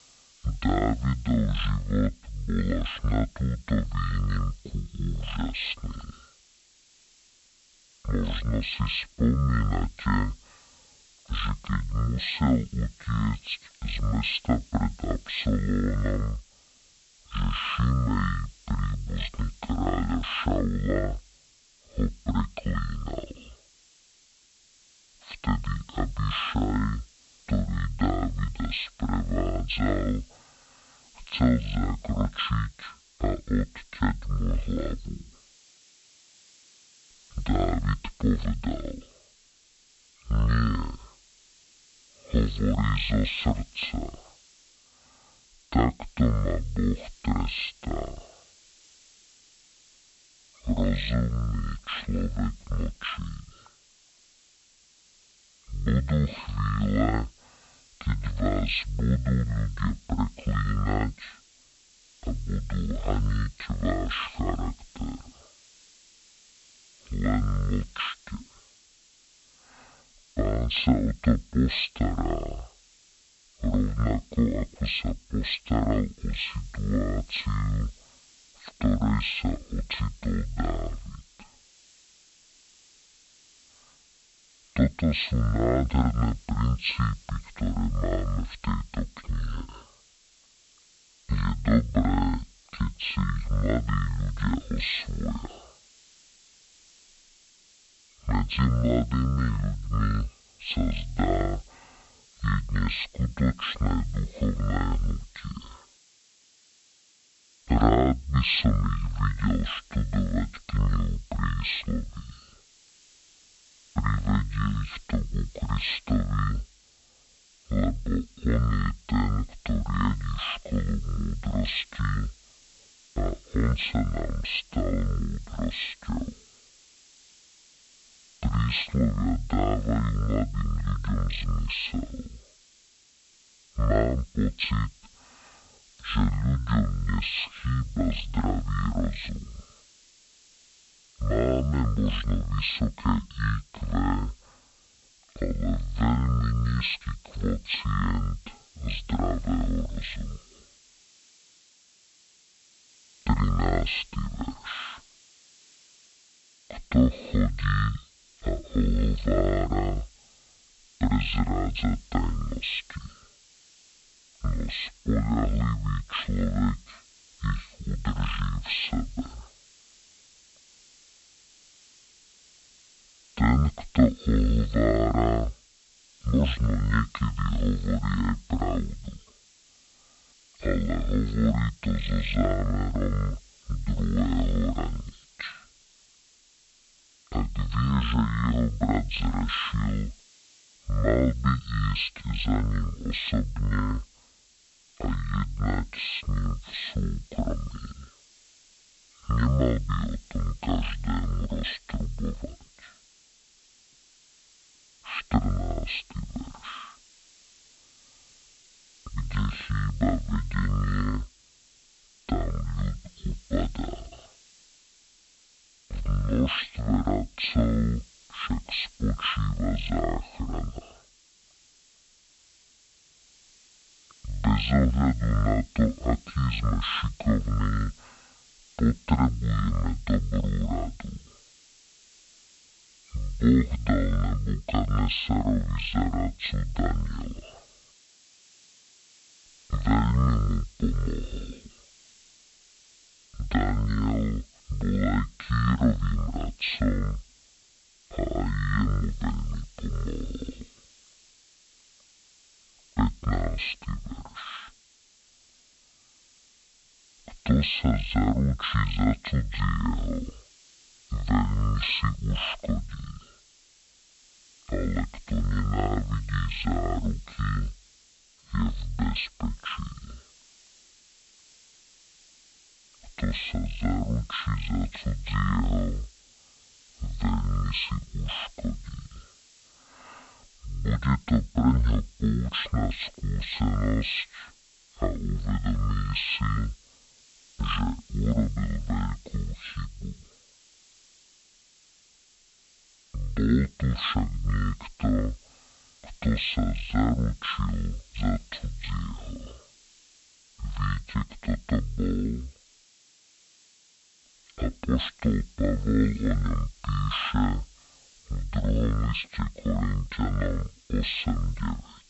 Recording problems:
high frequencies cut off; severe; nothing above 4.5 kHz
wrong speed and pitch; too slow and too low; 0.5 times normal speed
hiss; faint; throughout; 25 dB below the speech

